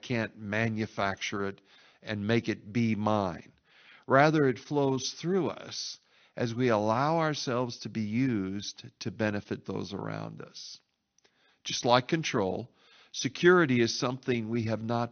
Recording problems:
high frequencies cut off; noticeable; nothing above 6 kHz

